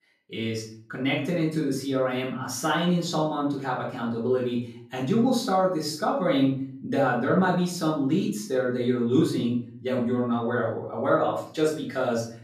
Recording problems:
off-mic speech; far
room echo; noticeable; dies away in 0.5 s

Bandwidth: 14.5 kHz